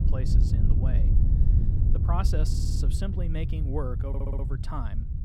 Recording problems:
wind noise on the microphone; heavy; 4 dB below the speech
low rumble; noticeable; throughout; 10 dB below the speech
audio stuttering; at 2.5 s and at 4 s

